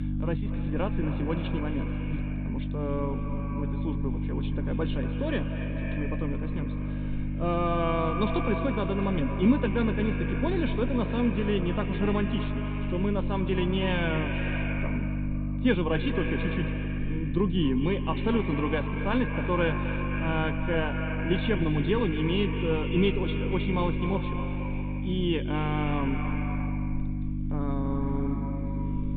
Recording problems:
echo of what is said; strong; throughout; 230 ms later, 8 dB below the speech
high frequencies cut off; severe; nothing above 4 kHz
electrical hum; loud; throughout; 50 Hz, 9 dB below the speech

